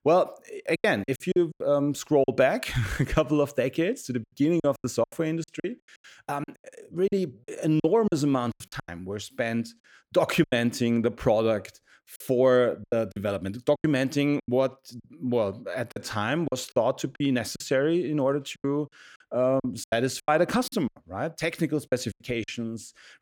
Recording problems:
choppy; very; 11% of the speech affected

